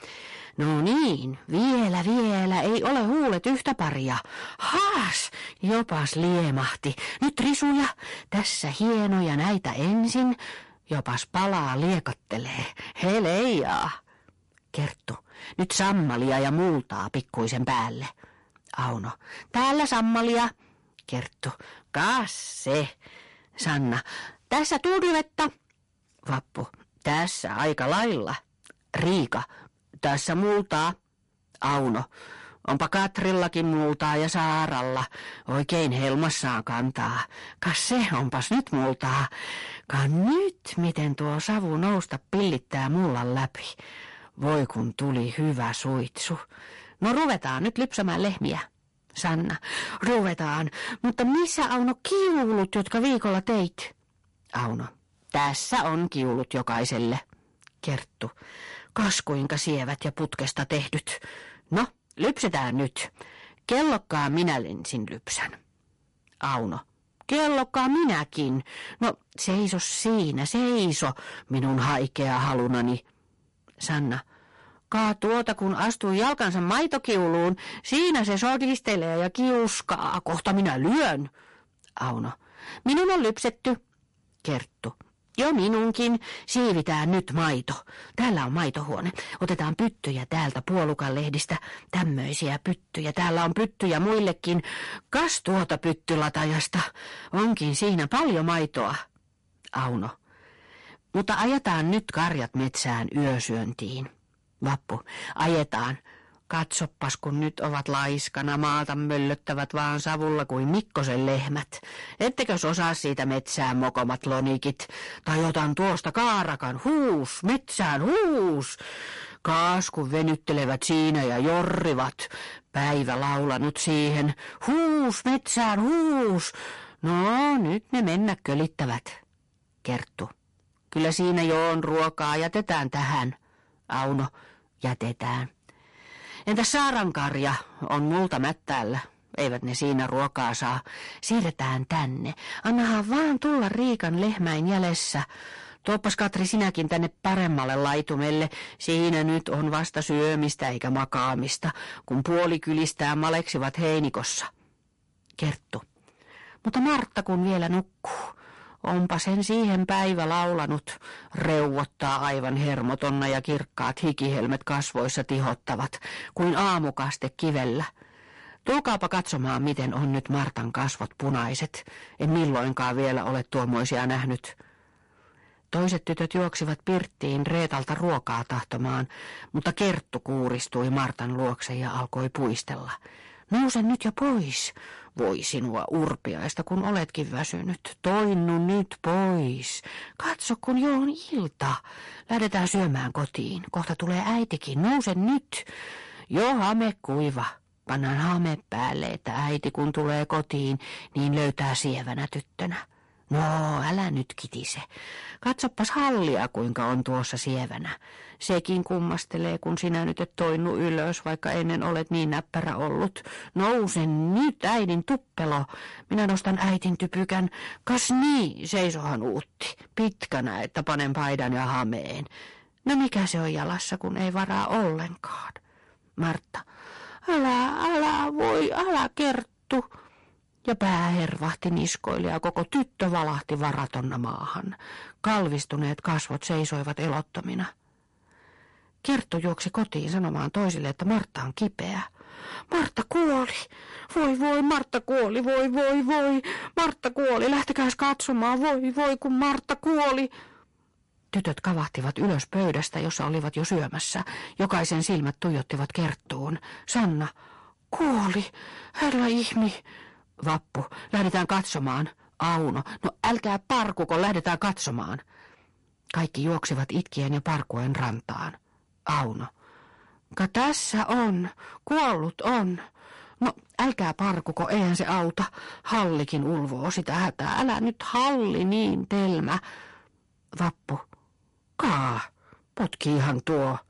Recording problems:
distortion; heavy; 12% of the sound clipped
garbled, watery; slightly; nothing above 11 kHz

